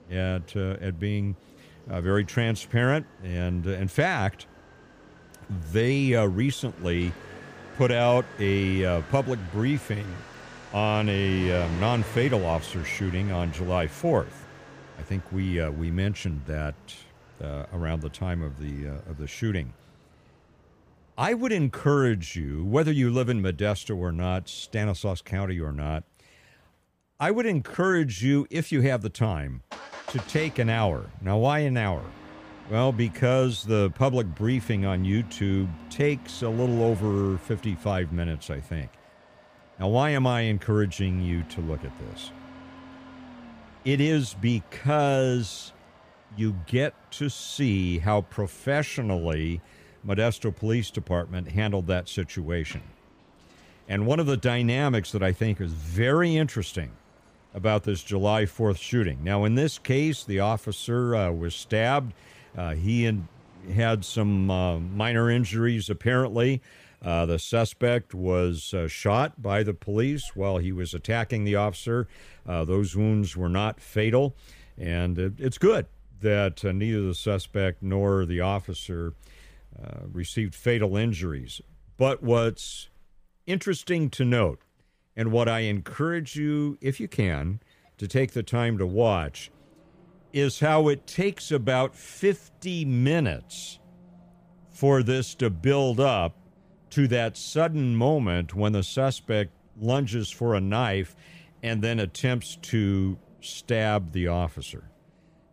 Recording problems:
traffic noise; faint; throughout; 20 dB below the speech

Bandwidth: 15 kHz